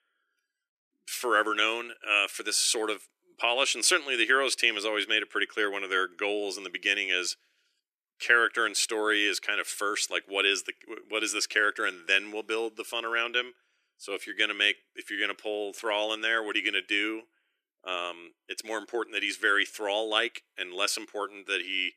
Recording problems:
thin; very; fading below 300 Hz

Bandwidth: 14.5 kHz